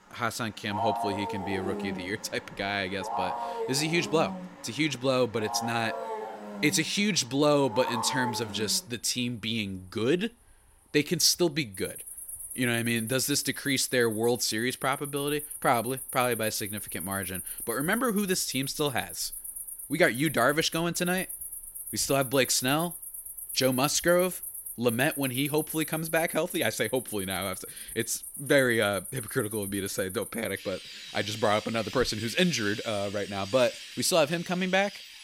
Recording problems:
animal sounds; loud; throughout; 9 dB below the speech

